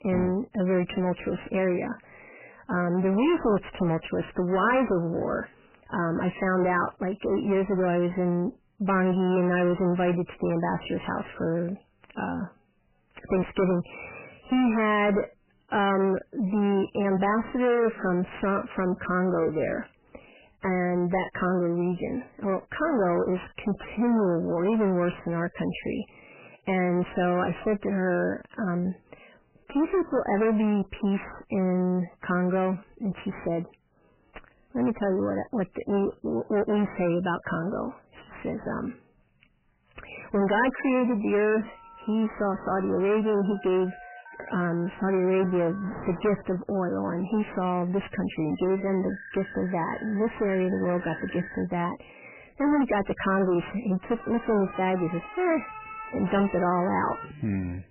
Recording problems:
distortion; heavy; 6 dB below the speech
garbled, watery; badly; nothing above 3 kHz
alarms or sirens; noticeable; from 42 s on; 15 dB below the speech

